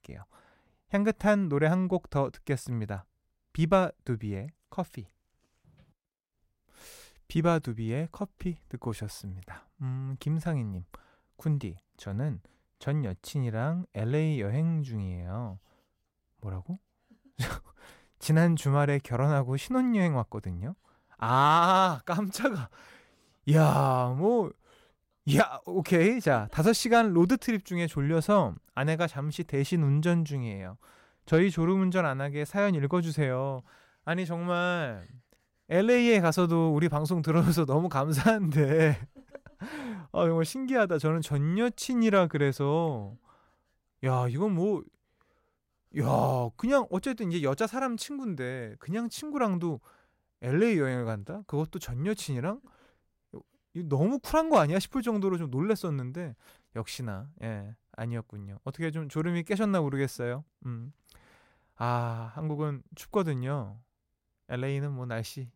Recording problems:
none

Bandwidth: 16 kHz